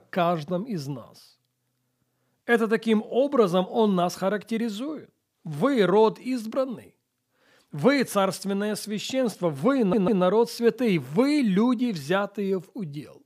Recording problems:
audio stuttering; at 10 s

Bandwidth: 15 kHz